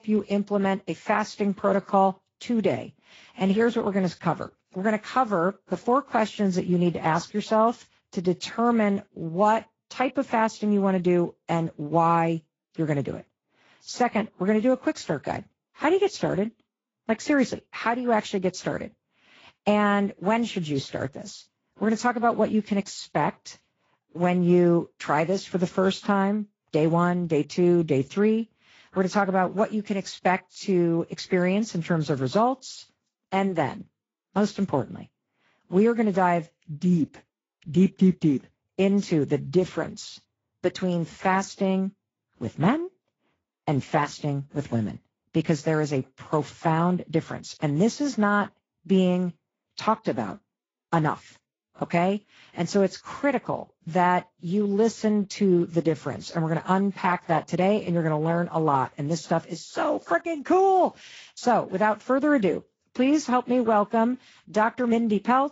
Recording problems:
garbled, watery; slightly; nothing above 7.5 kHz

